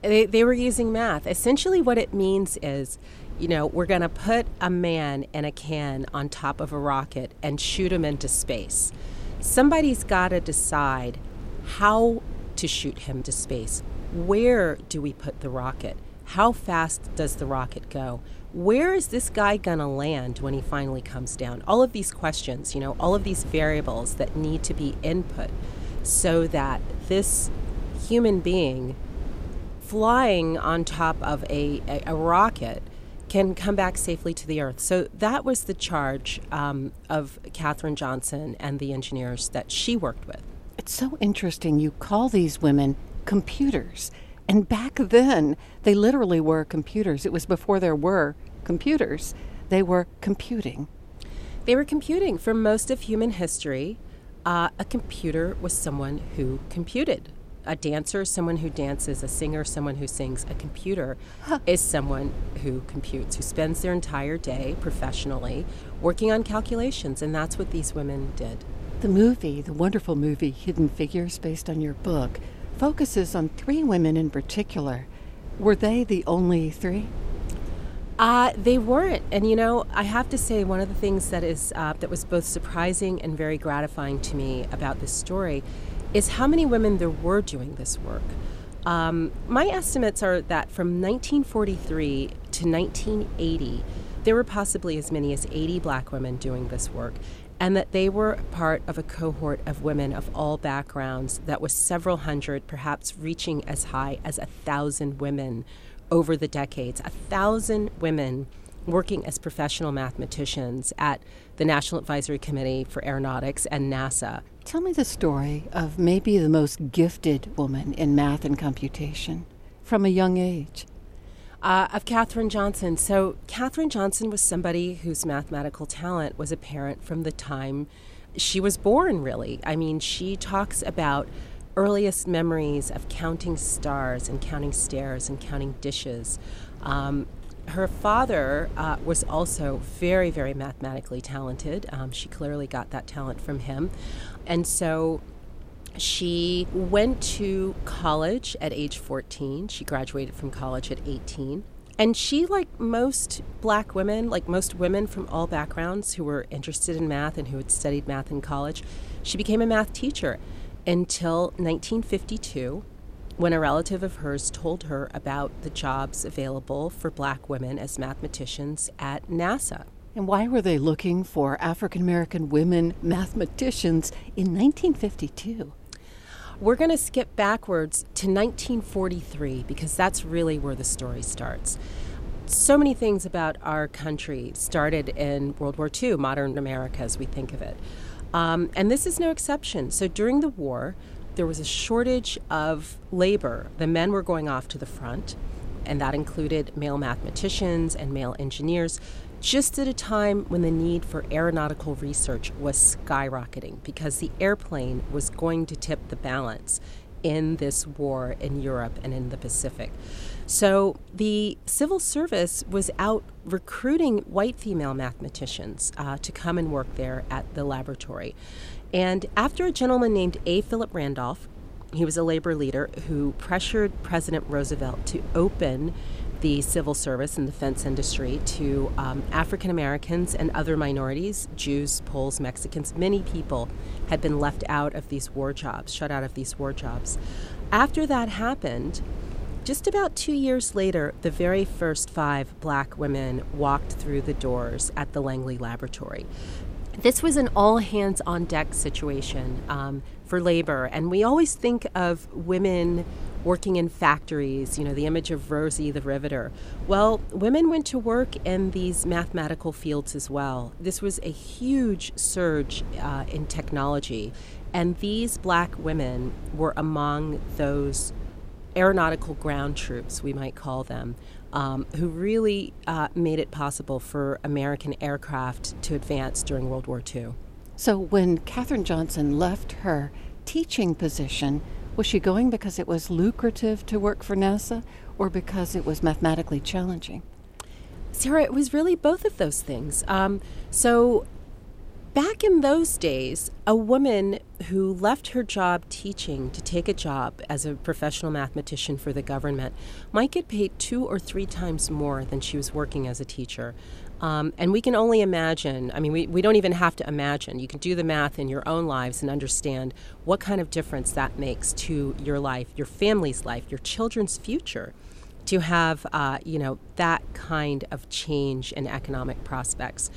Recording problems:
wind noise on the microphone; occasional gusts; 20 dB below the speech

